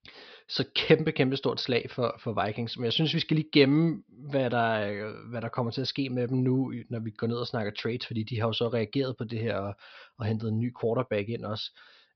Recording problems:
high frequencies cut off; noticeable; nothing above 5.5 kHz

